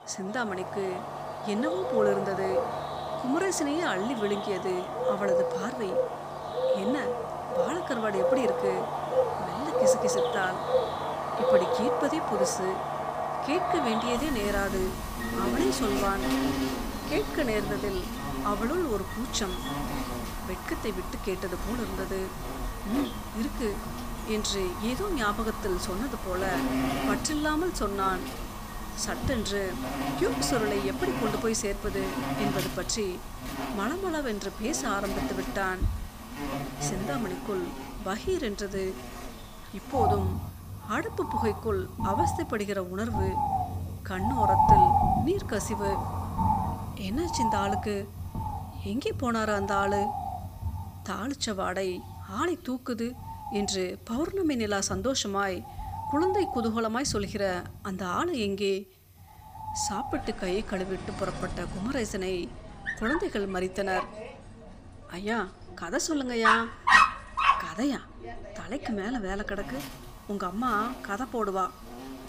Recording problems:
animal sounds; very loud; throughout; 1 dB above the speech

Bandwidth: 15 kHz